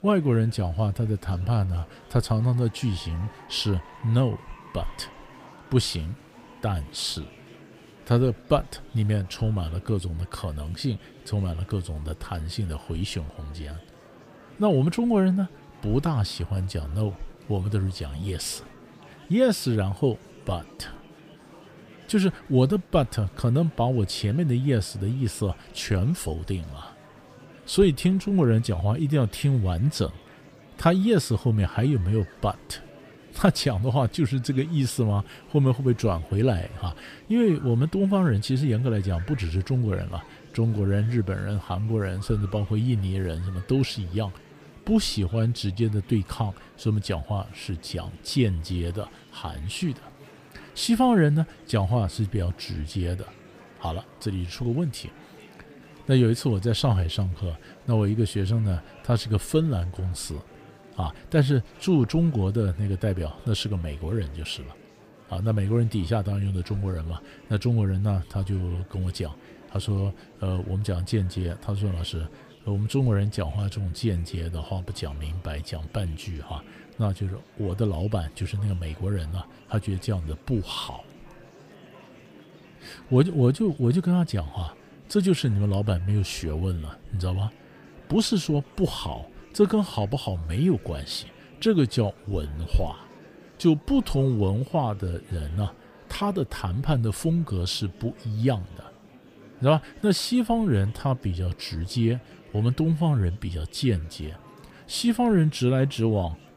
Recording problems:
murmuring crowd; faint; throughout; 25 dB below the speech

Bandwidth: 15 kHz